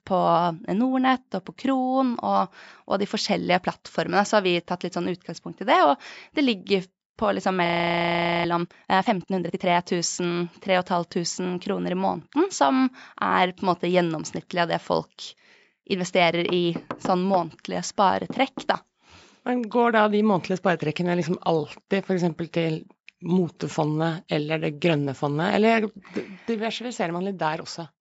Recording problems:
high frequencies cut off; noticeable; nothing above 8 kHz
audio freezing; at 7.5 s for 1 s
door banging; noticeable; from 16 to 20 s; peak 9 dB below the speech

